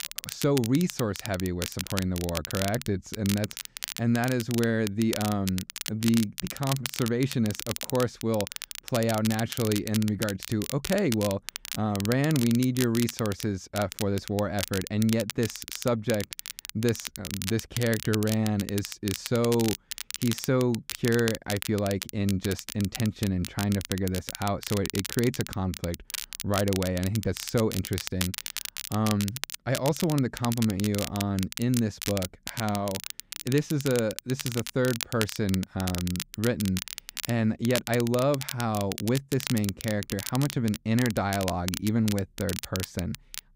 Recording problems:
crackle, like an old record; loud; 7 dB below the speech

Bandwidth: 15.5 kHz